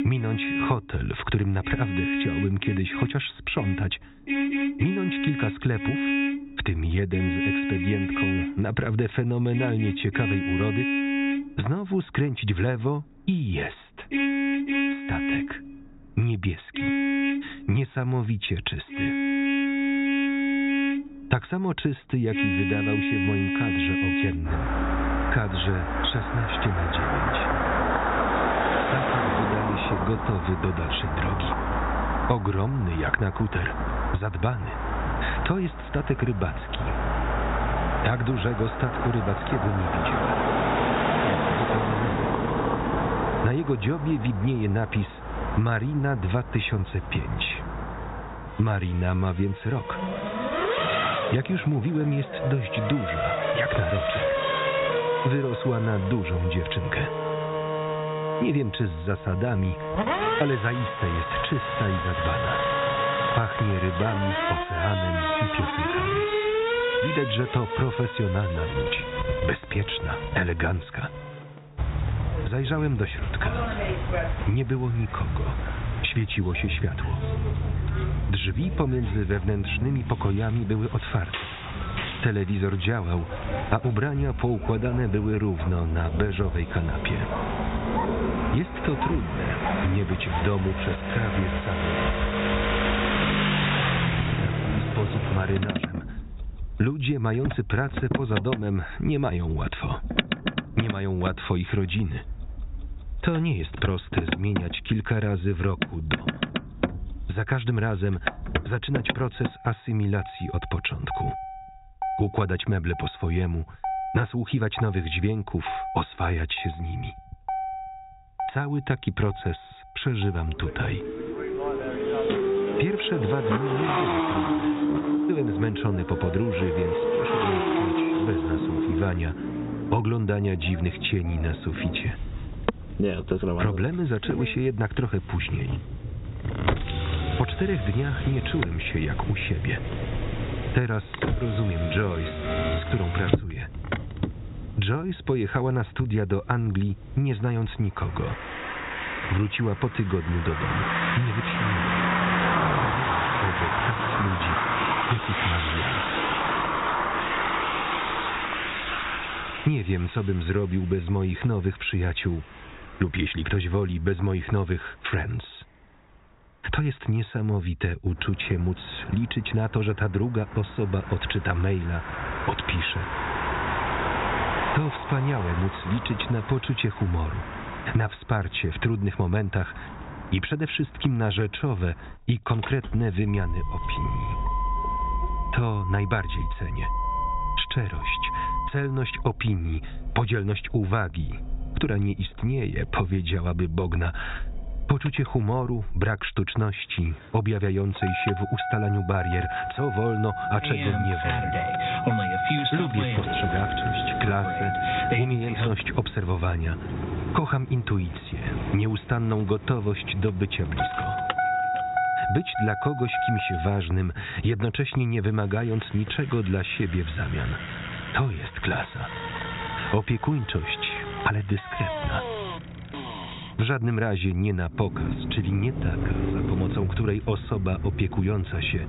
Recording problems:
high frequencies cut off; severe; nothing above 4 kHz
squashed, flat; somewhat, background pumping
traffic noise; loud; throughout; 1 dB below the speech

